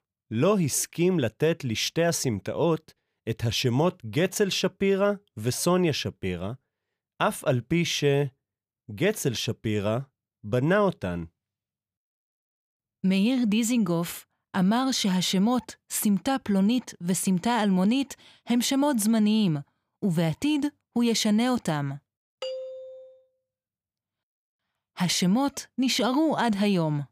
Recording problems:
none

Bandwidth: 15 kHz